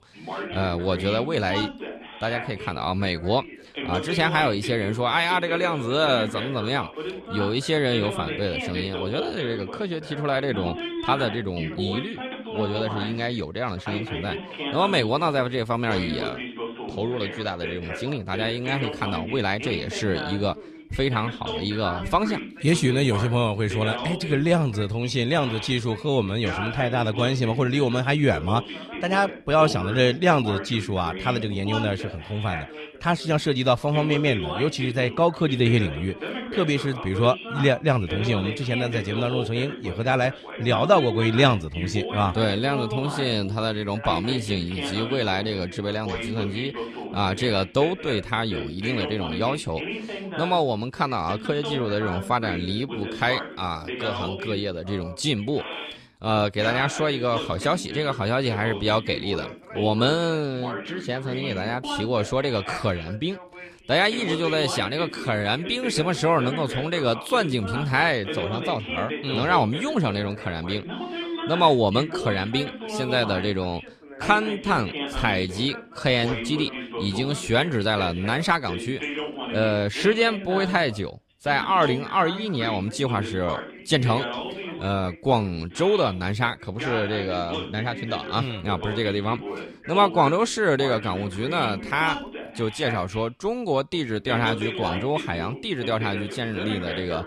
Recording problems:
background chatter; loud; throughout; 2 voices, 8 dB below the speech

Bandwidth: 14.5 kHz